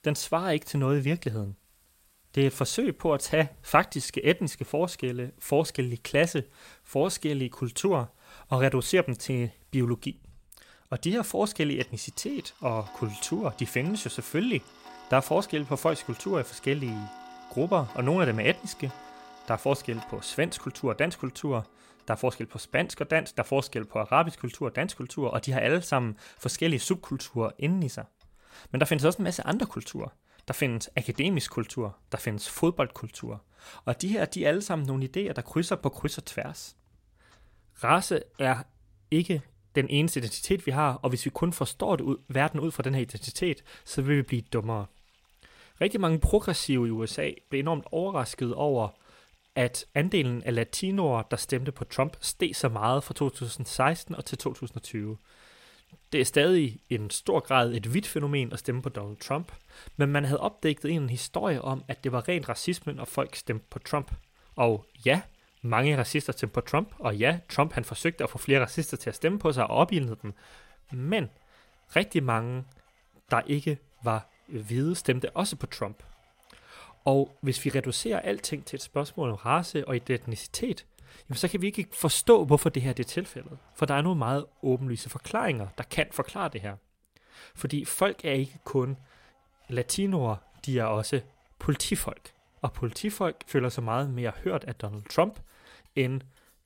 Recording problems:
household noises; faint; throughout; 30 dB below the speech

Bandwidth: 16 kHz